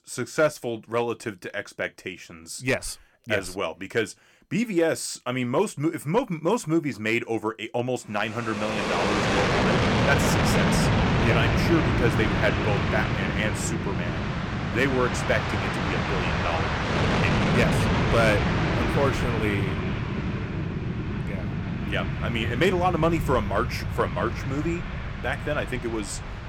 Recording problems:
train or aircraft noise; very loud; from 9 s on; 2 dB above the speech

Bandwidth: 17.5 kHz